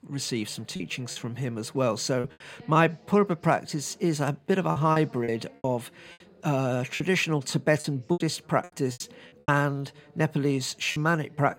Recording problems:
voice in the background; faint; throughout; 25 dB below the speech
choppy; very; 8% of the speech affected

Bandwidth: 16.5 kHz